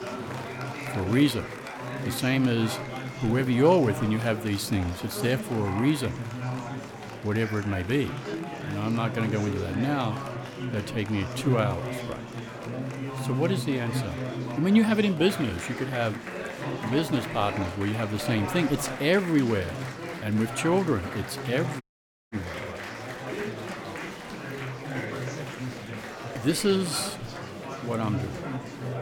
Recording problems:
murmuring crowd; loud; throughout; 7 dB below the speech
traffic noise; faint; throughout; 30 dB below the speech
audio cutting out; at 22 s for 0.5 s

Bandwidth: 18 kHz